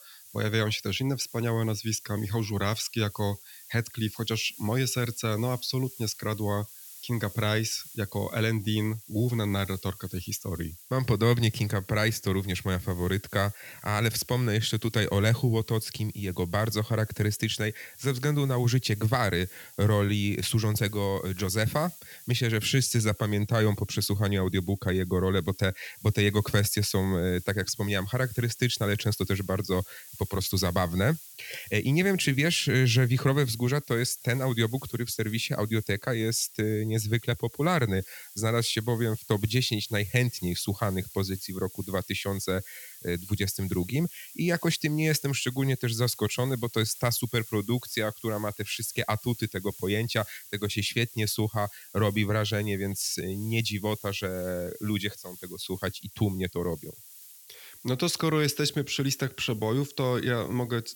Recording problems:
hiss; noticeable; throughout; 15 dB below the speech

